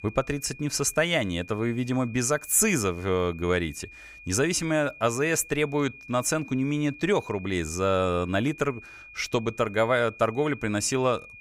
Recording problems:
high-pitched whine; noticeable; throughout; 2.5 kHz, 20 dB below the speech

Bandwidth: 15.5 kHz